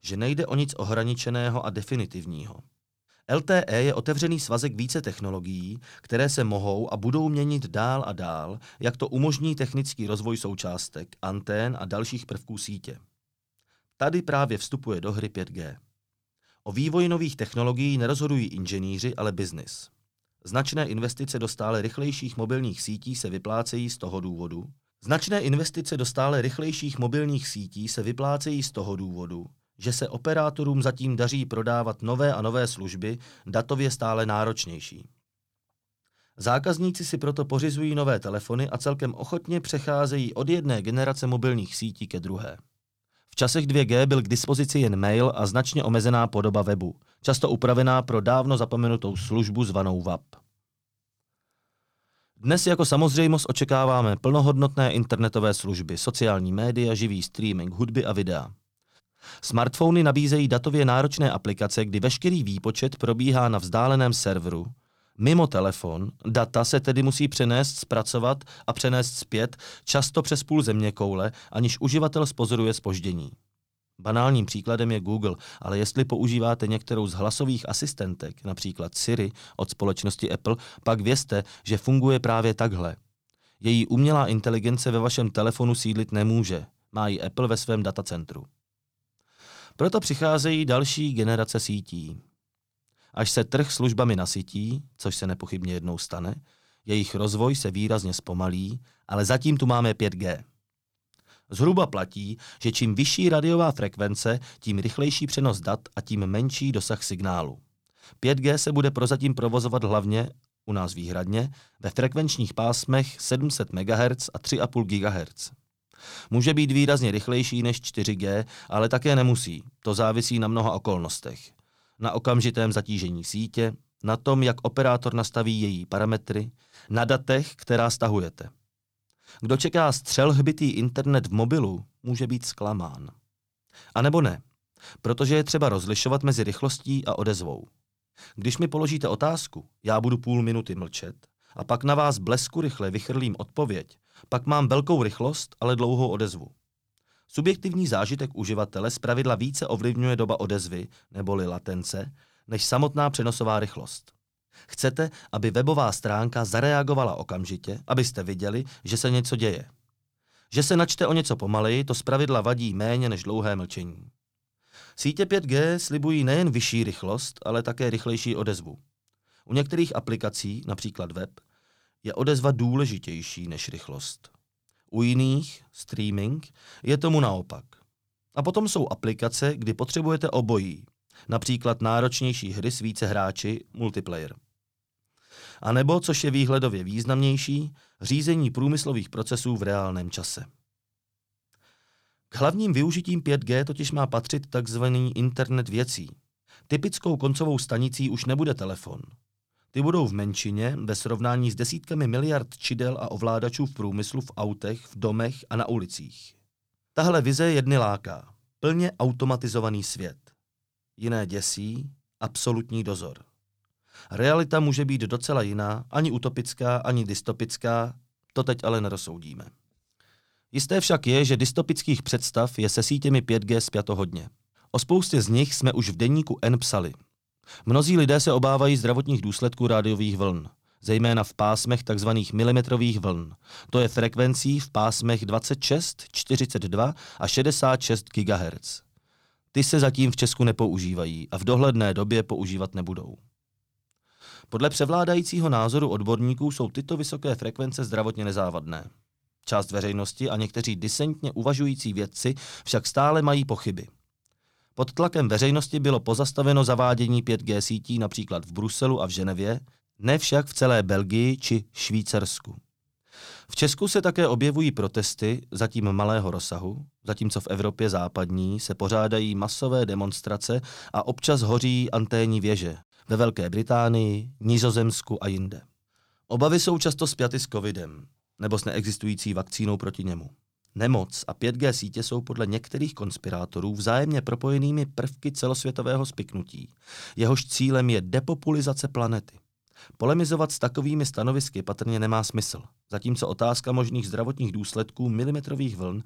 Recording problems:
none

